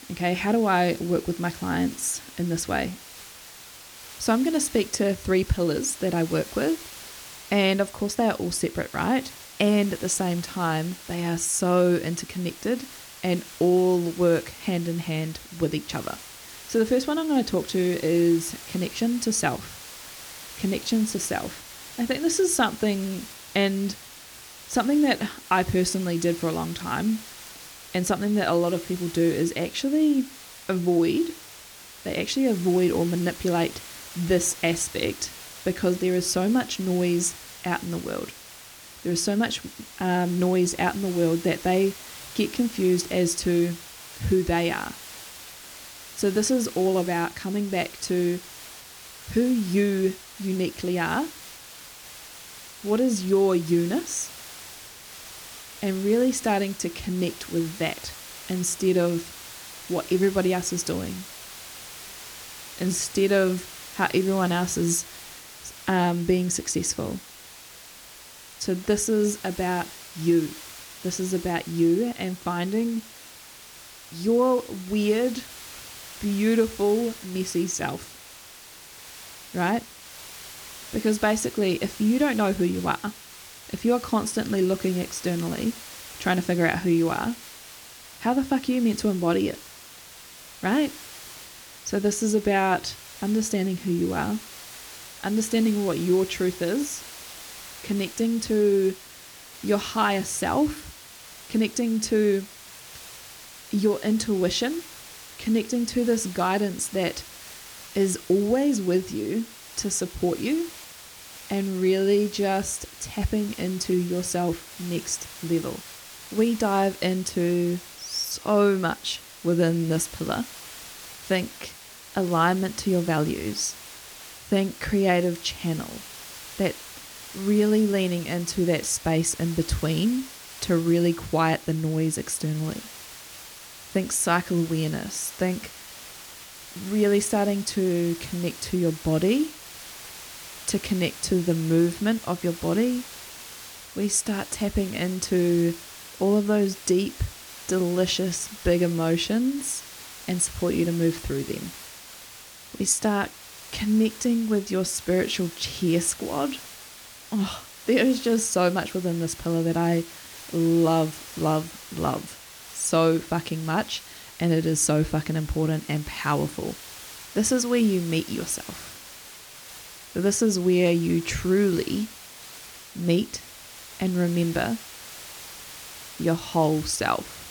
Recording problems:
hiss; noticeable; throughout; 15 dB below the speech

